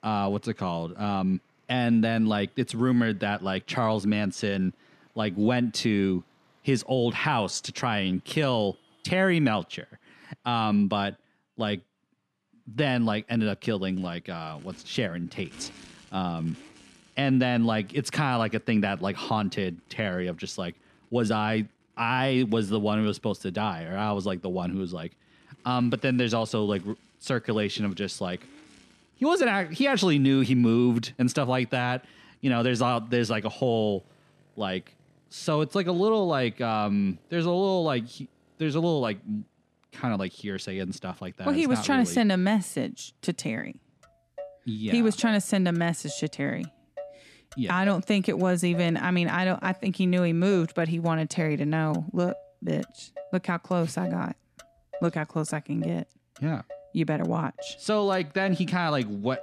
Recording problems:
traffic noise; faint; throughout; 25 dB below the speech

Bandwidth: 13.5 kHz